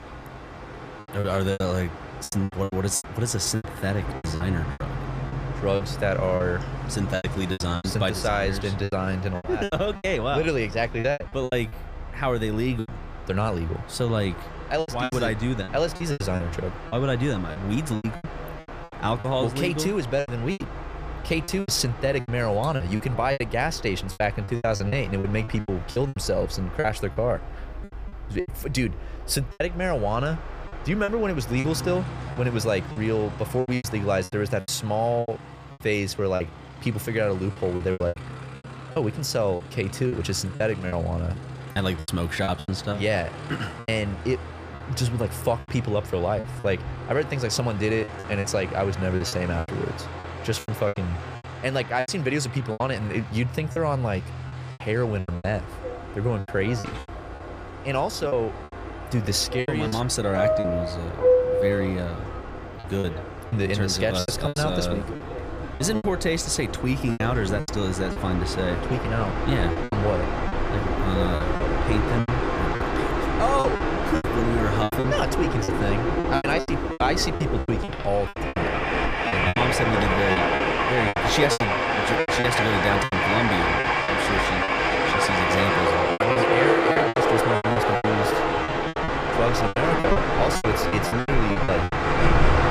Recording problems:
train or aircraft noise; loud; throughout; 1 dB below the speech
choppy; very; 13% of the speech affected

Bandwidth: 15 kHz